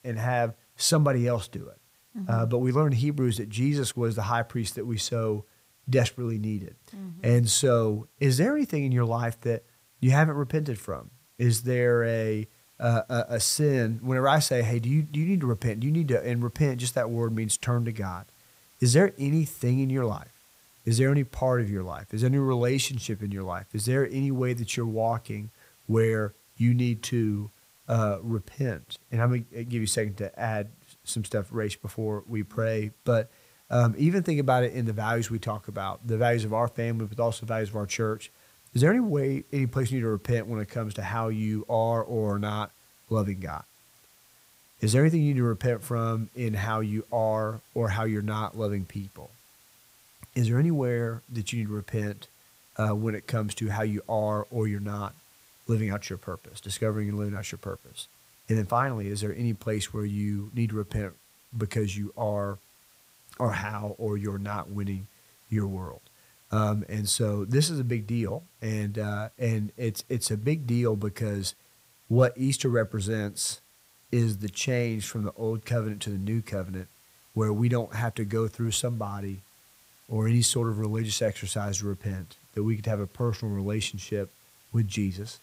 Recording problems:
hiss; faint; throughout; 30 dB below the speech

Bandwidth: 15.5 kHz